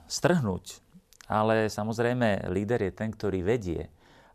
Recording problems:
none

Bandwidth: 14 kHz